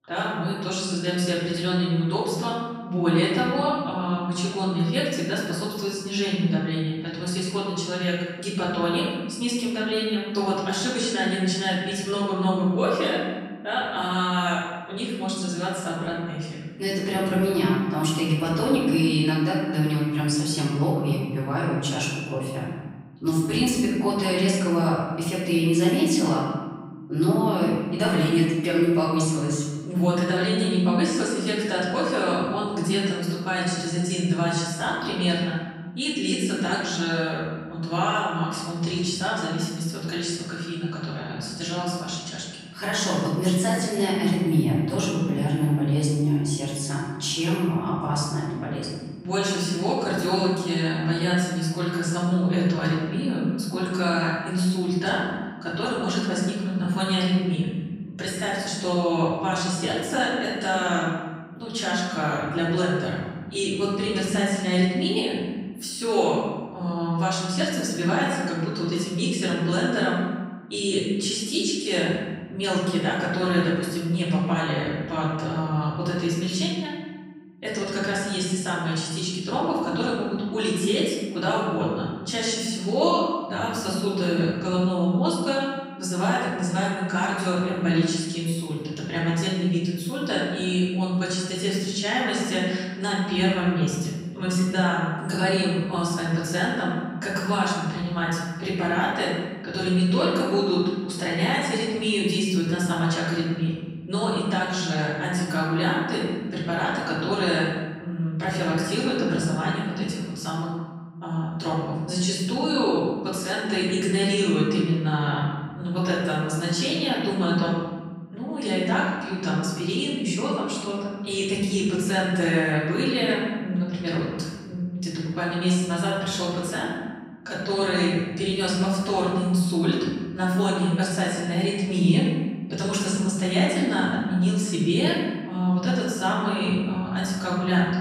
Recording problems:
off-mic speech; far
room echo; noticeable; dies away in 1.3 s

